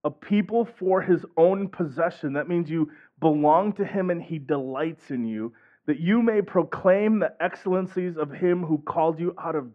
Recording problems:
muffled; very; fading above 1.5 kHz

